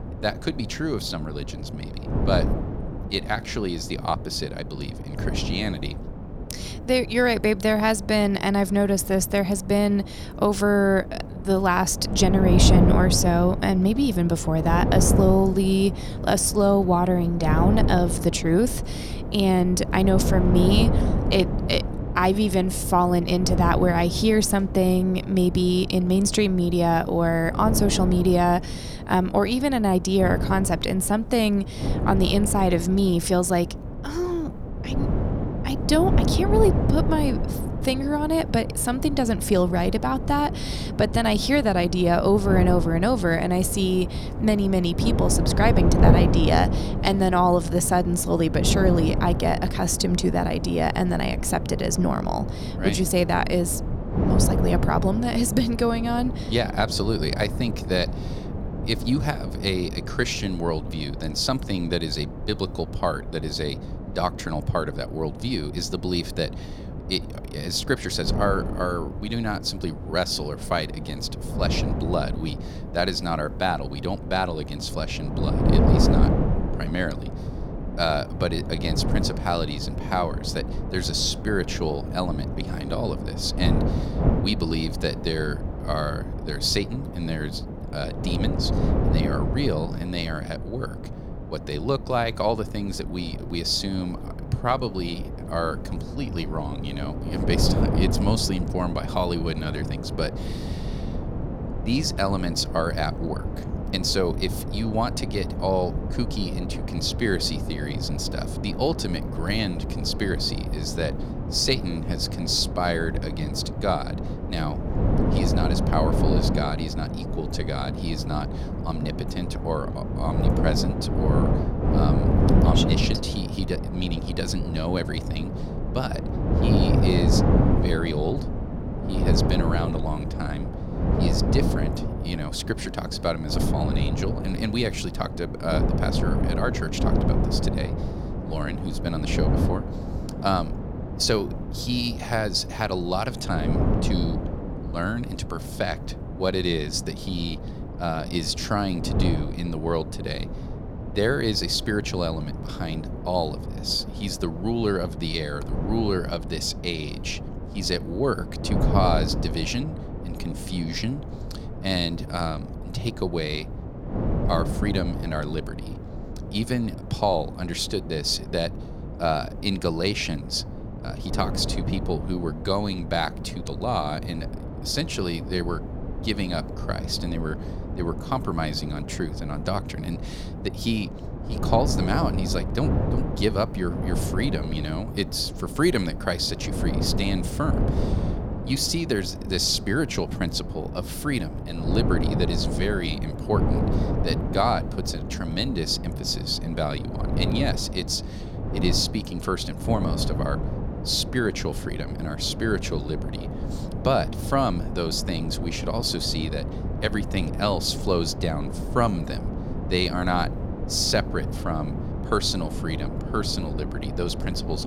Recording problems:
wind noise on the microphone; heavy; 8 dB below the speech

